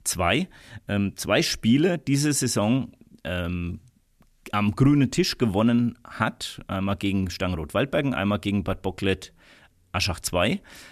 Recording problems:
none

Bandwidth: 14 kHz